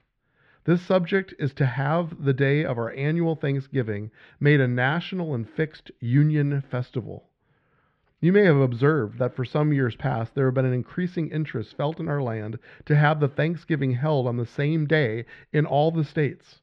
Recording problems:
muffled; very; fading above 2.5 kHz

